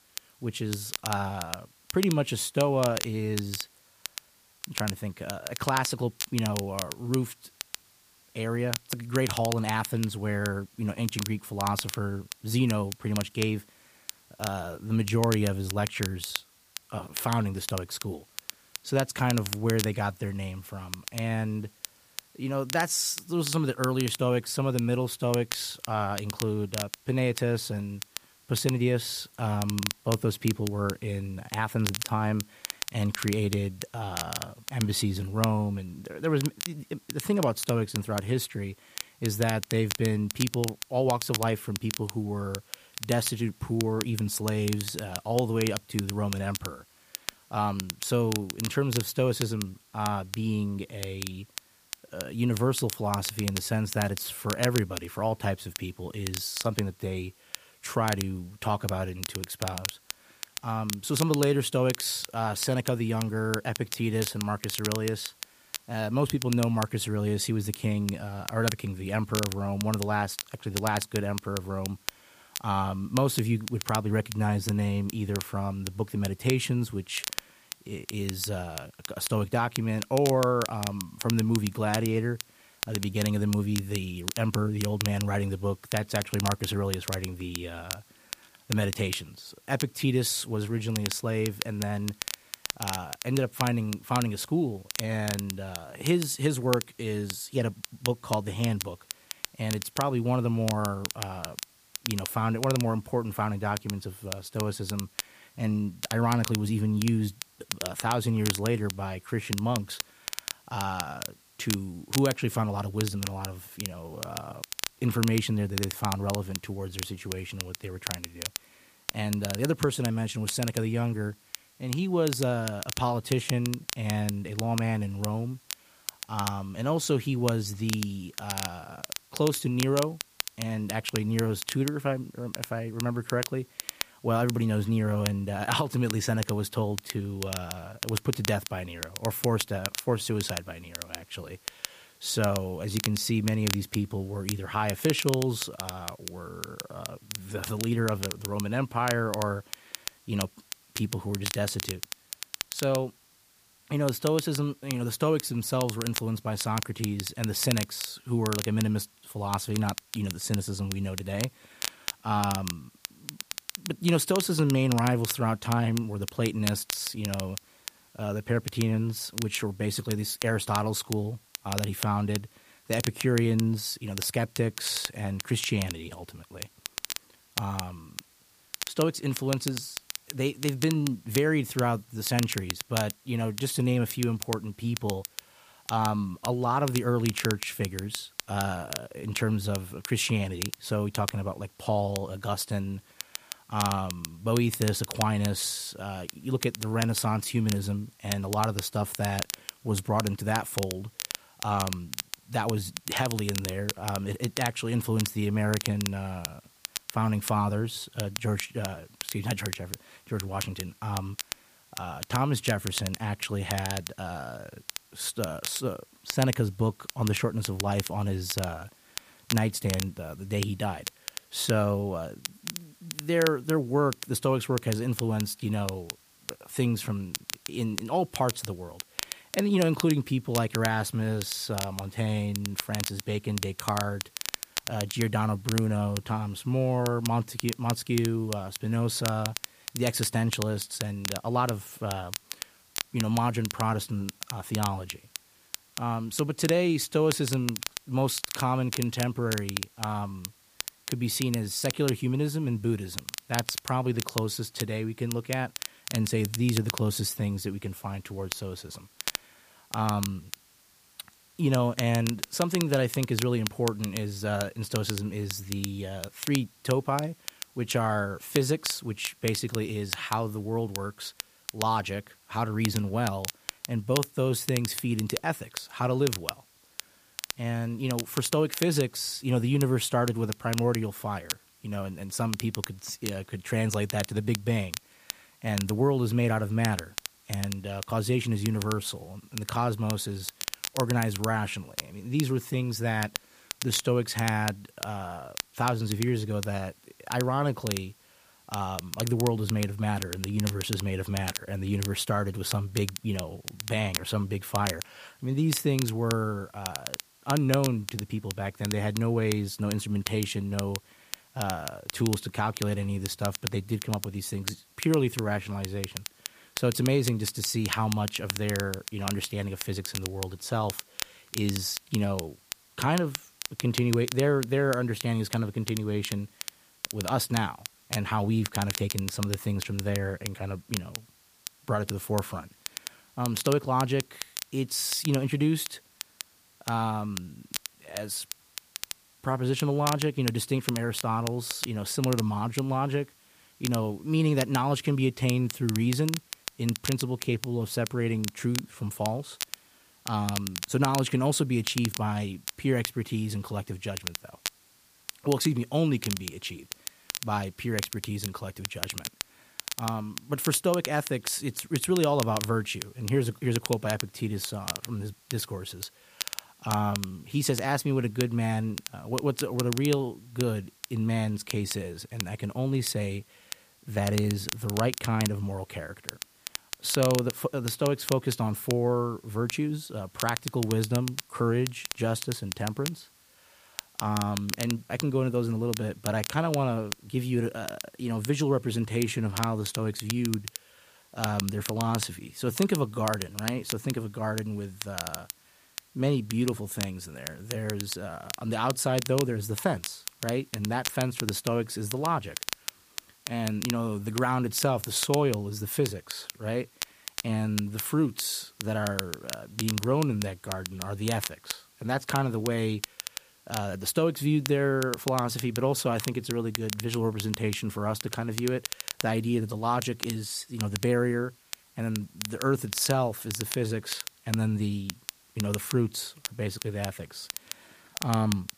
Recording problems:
crackle, like an old record; loud; 8 dB below the speech
hiss; faint; throughout; 30 dB below the speech

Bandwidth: 15 kHz